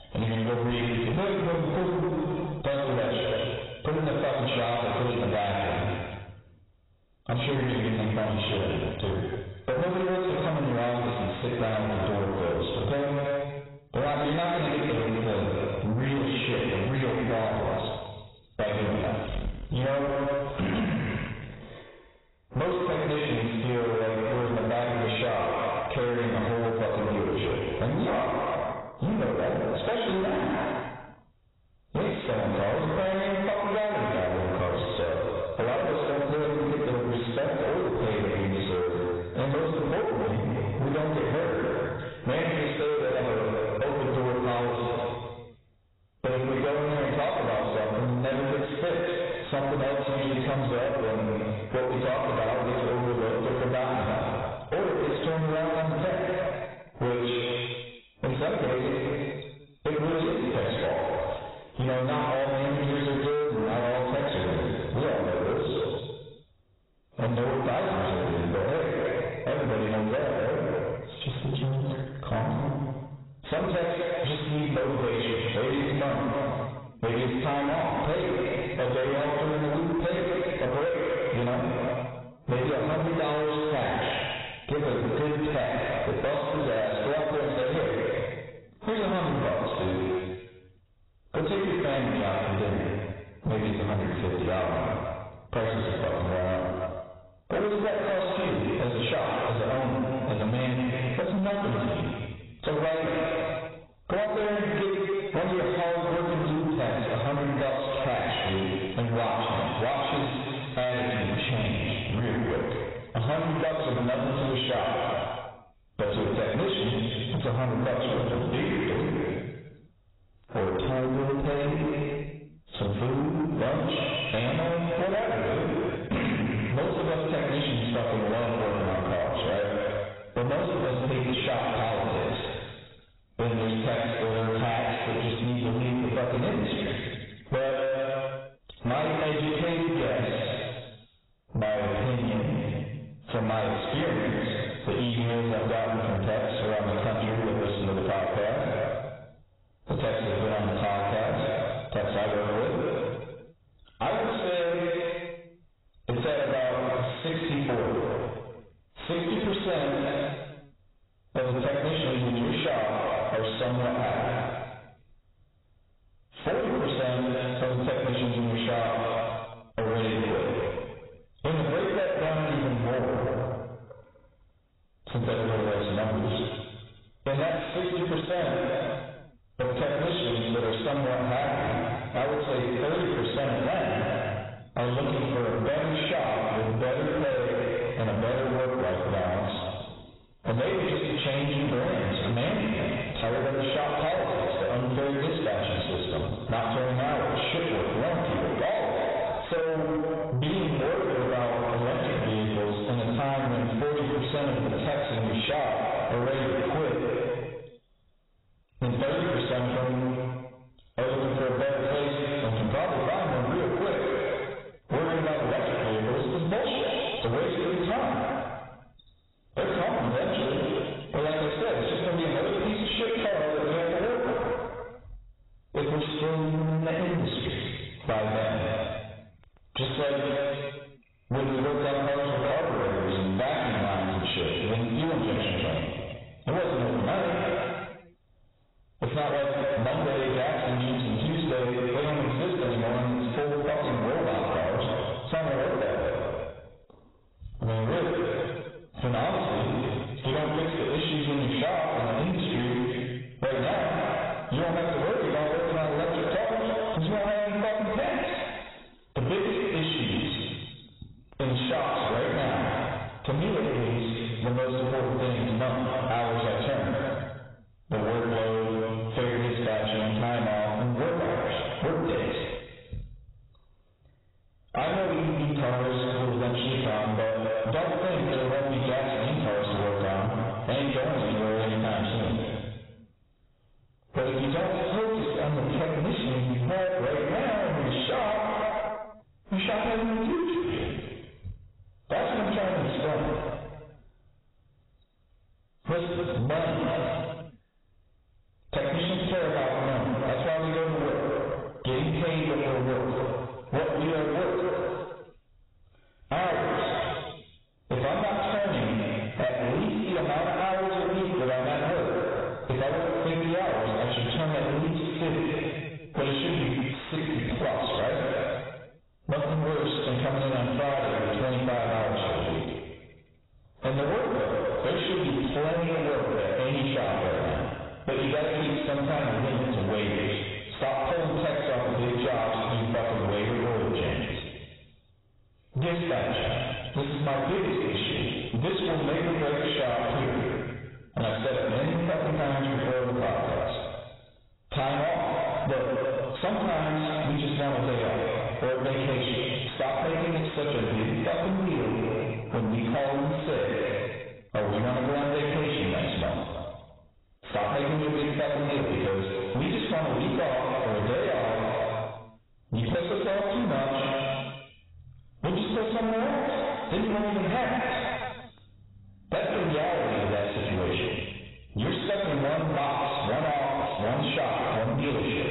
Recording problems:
distortion; heavy; 6 dB below the speech
garbled, watery; badly; nothing above 4 kHz
room echo; noticeable; dies away in 1.2 s
off-mic speech; somewhat distant
squashed, flat; somewhat

